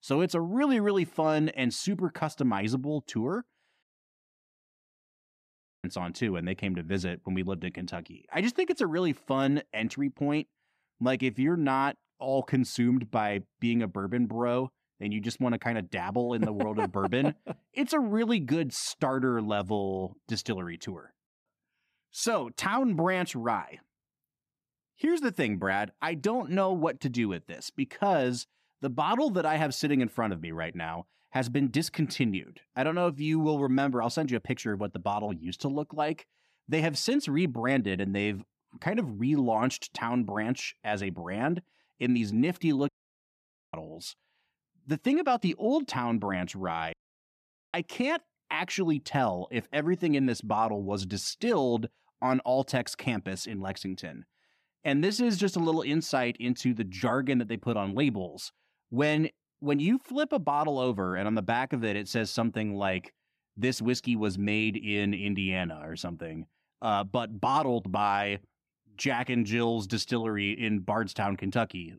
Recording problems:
audio cutting out; at 4 s for 2 s, at 43 s for 1 s and at 47 s for 1 s

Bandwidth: 14.5 kHz